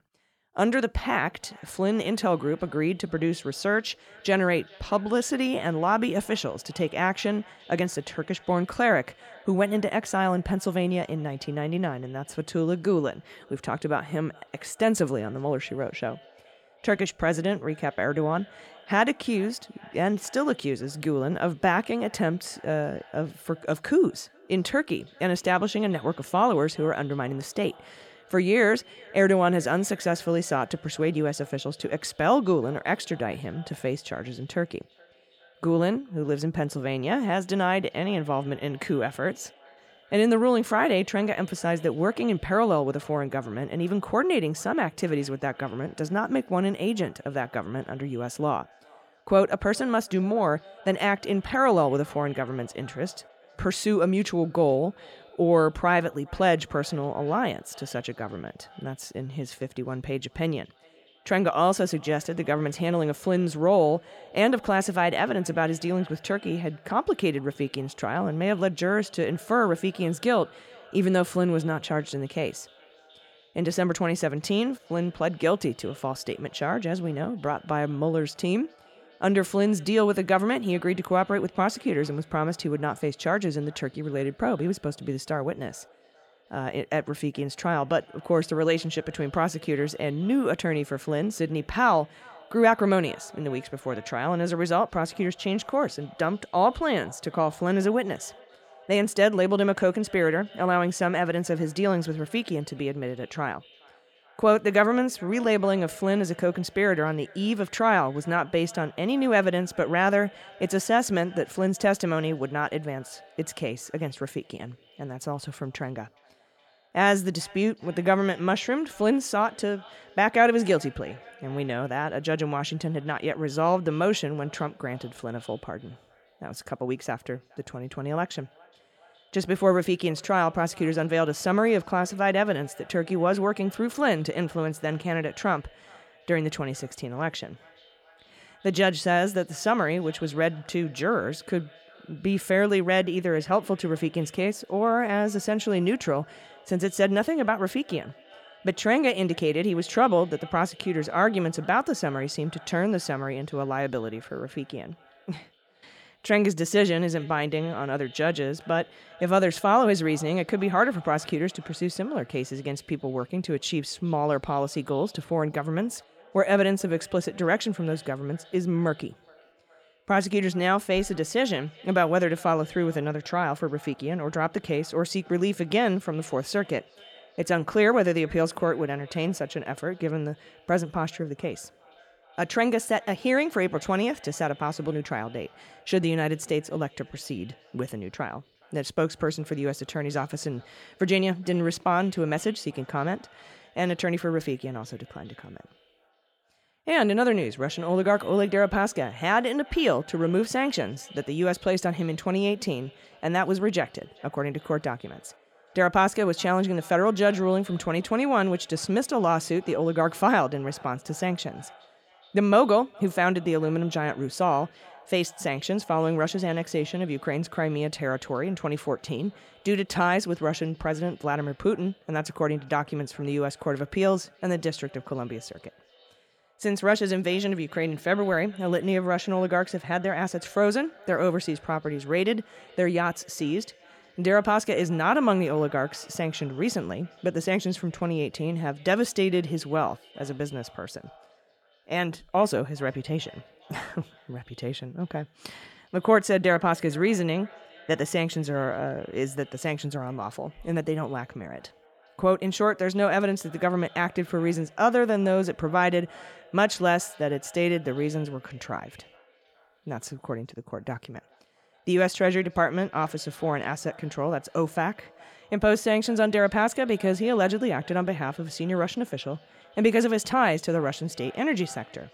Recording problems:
echo of what is said; faint; throughout; 420 ms later, 25 dB below the speech

